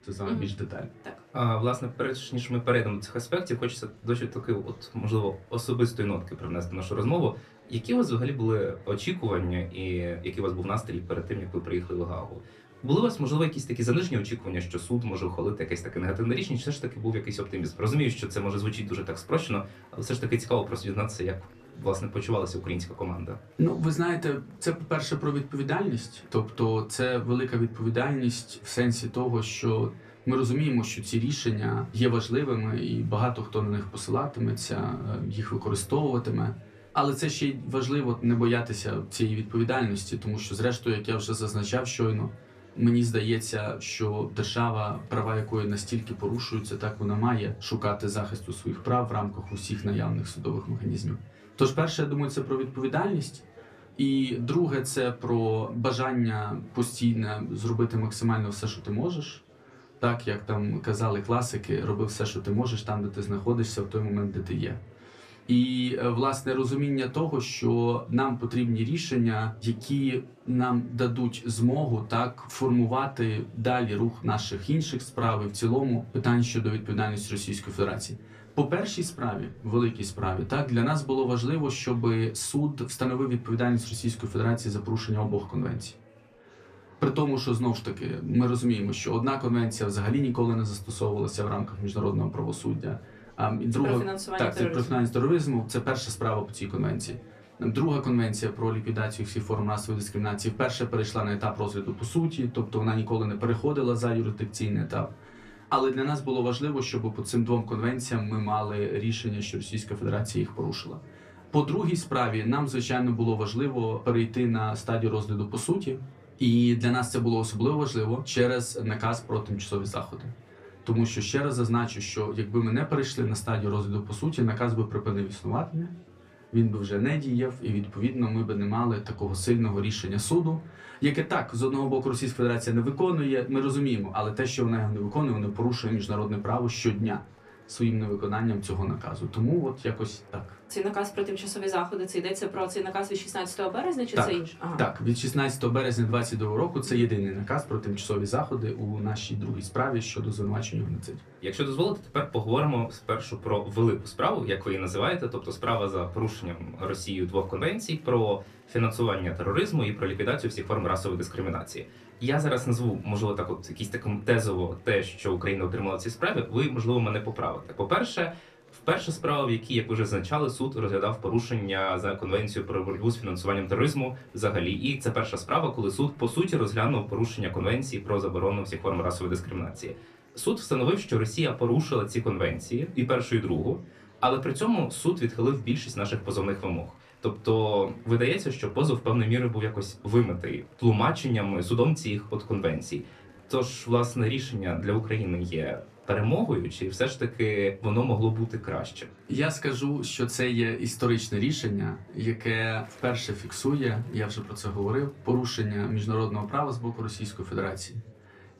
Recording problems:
room echo; very slight; dies away in 0.2 s
off-mic speech; somewhat distant
chatter from many people; faint; throughout; 25 dB below the speech

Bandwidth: 14.5 kHz